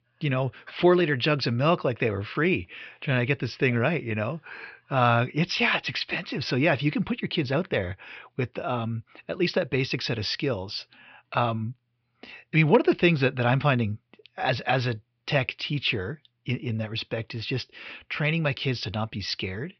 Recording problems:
high frequencies cut off; noticeable; nothing above 5.5 kHz

